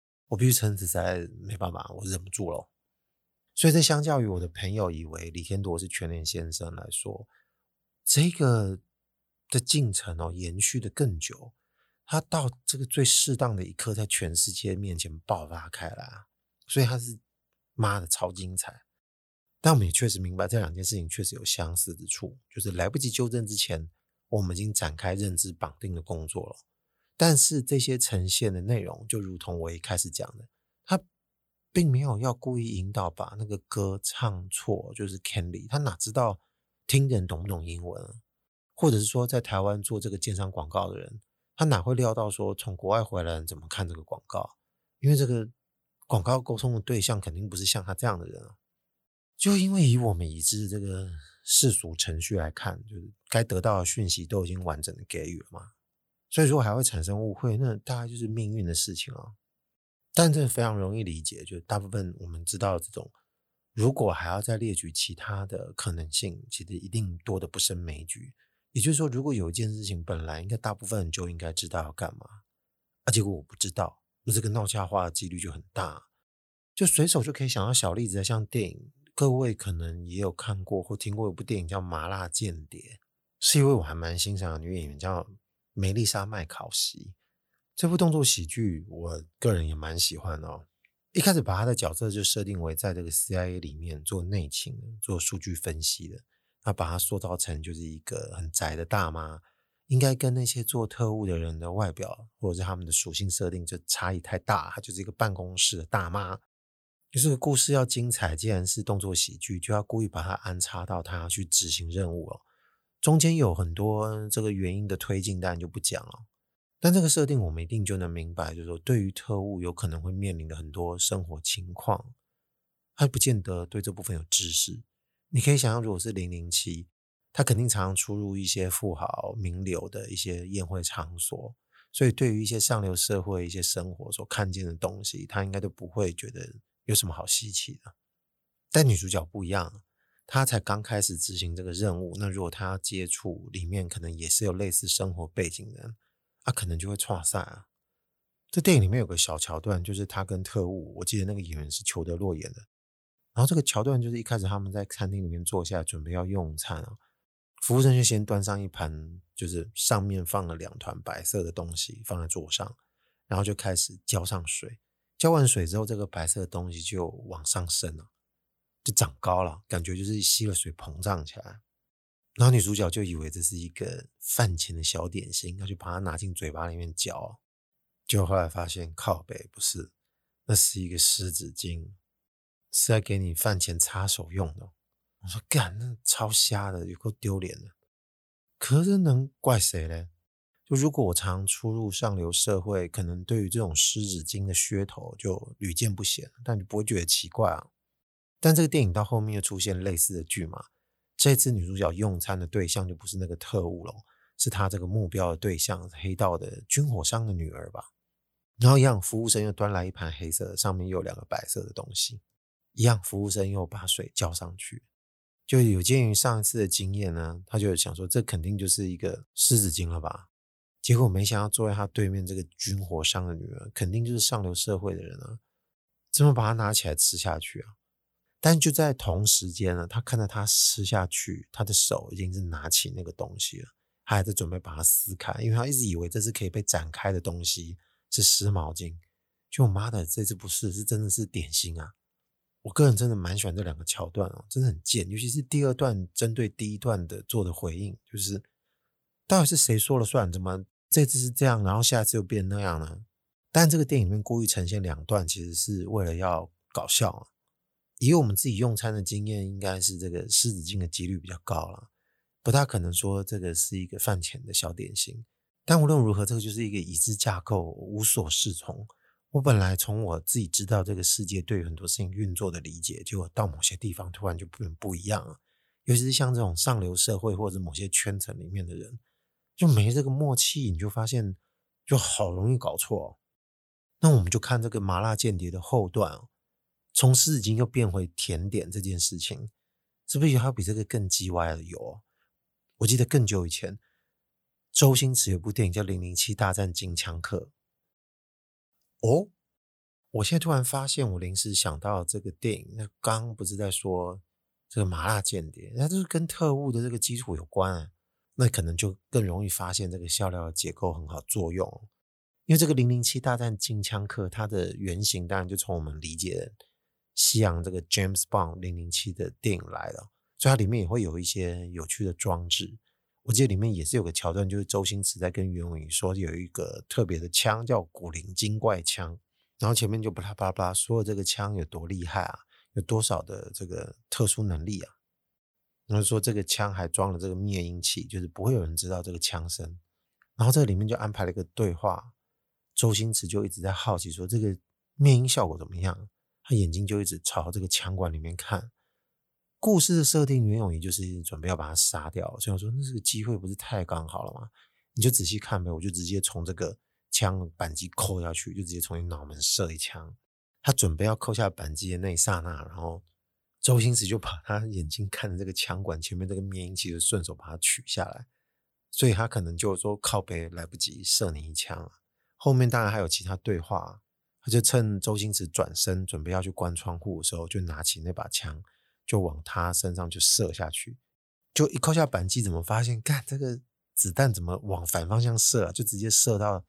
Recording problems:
none

